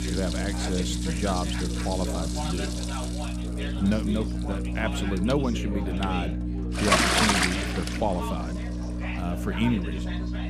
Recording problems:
household noises; very loud; throughout; 2 dB above the speech
electrical hum; loud; throughout; 60 Hz, 8 dB below the speech
background chatter; loud; throughout; 3 voices, 9 dB below the speech

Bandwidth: 15 kHz